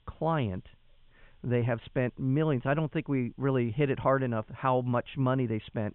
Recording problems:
high frequencies cut off; severe; nothing above 3.5 kHz
hiss; very faint; throughout; 45 dB below the speech

